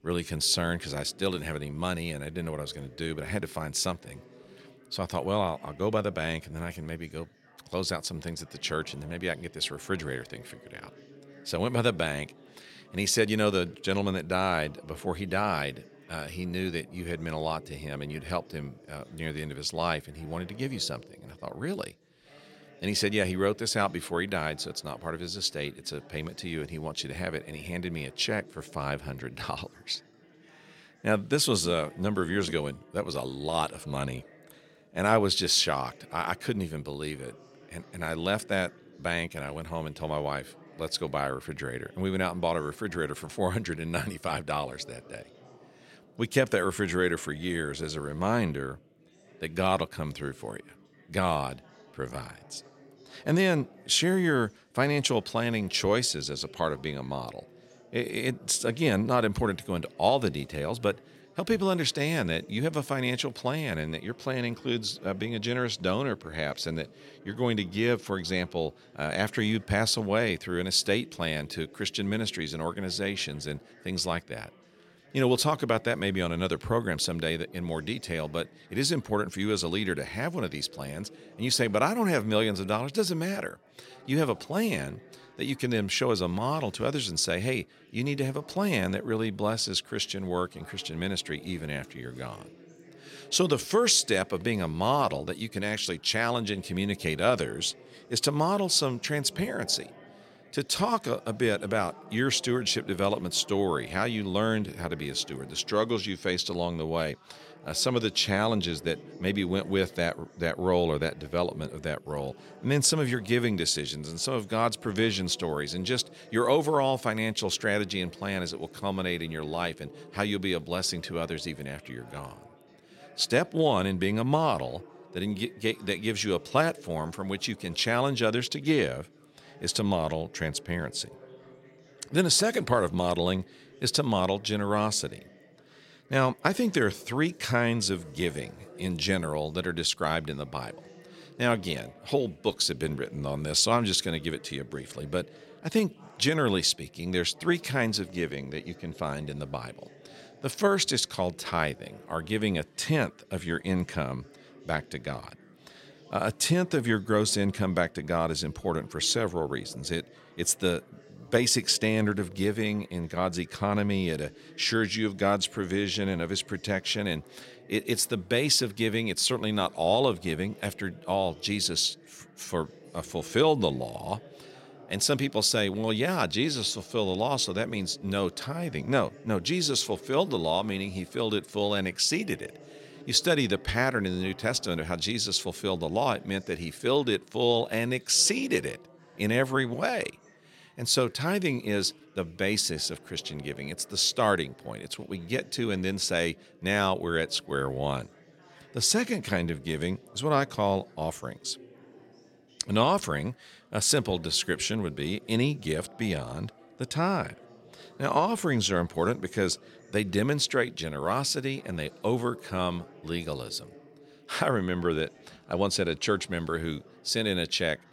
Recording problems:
chatter from many people; faint; throughout; 25 dB below the speech

